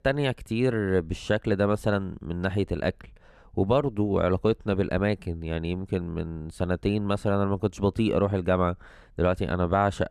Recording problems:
none

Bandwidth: 13.5 kHz